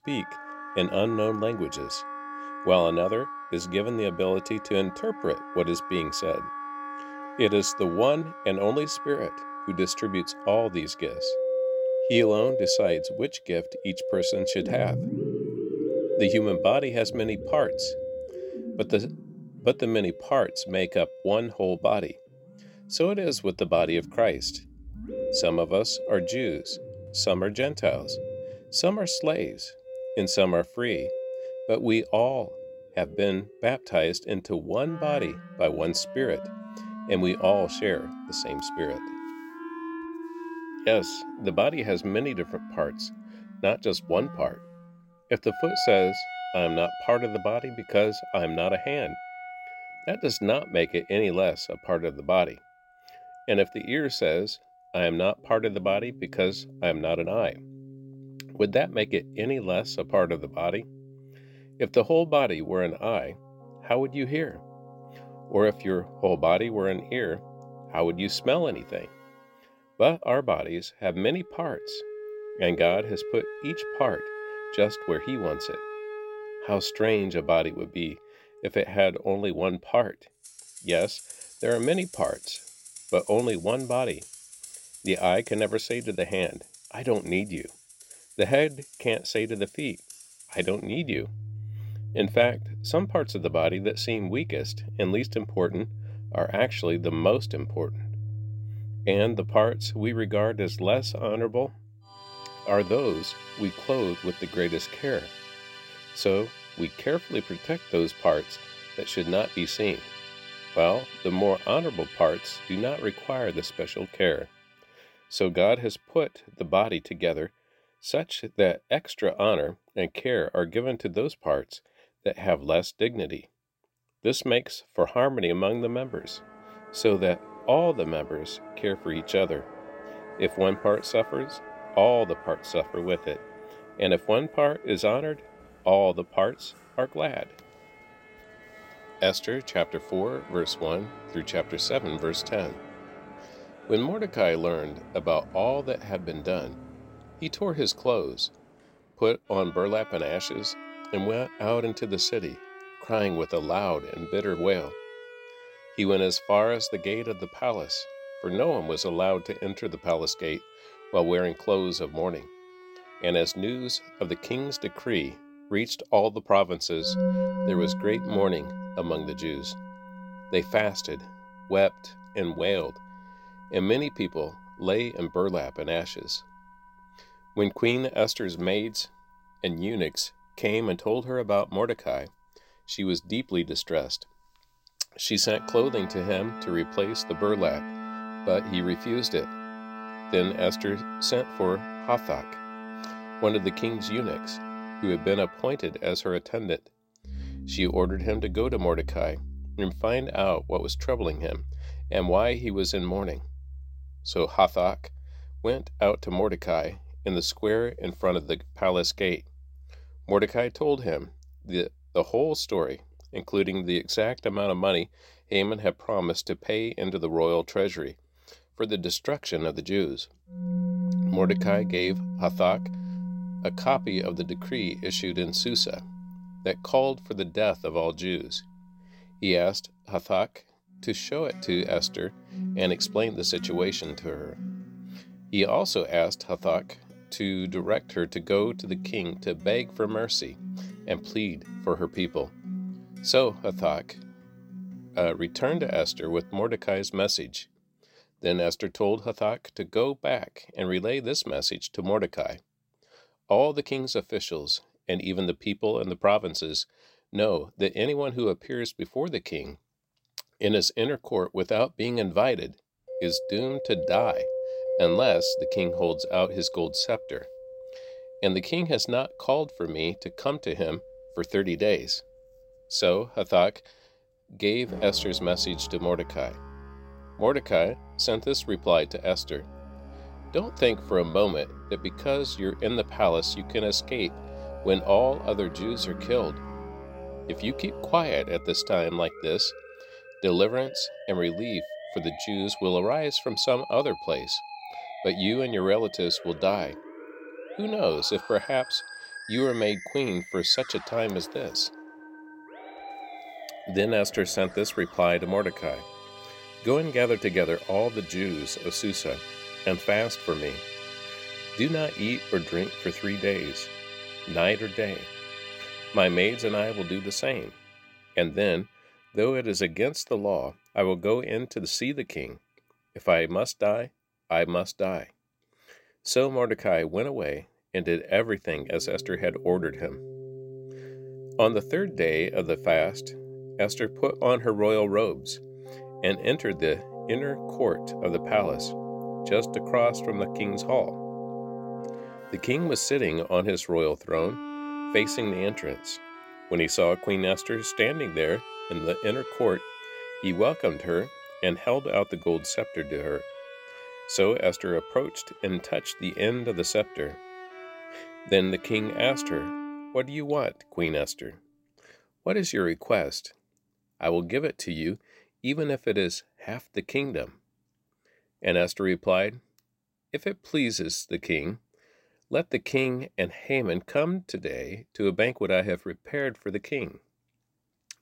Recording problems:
background music; noticeable; throughout; 10 dB below the speech

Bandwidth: 16 kHz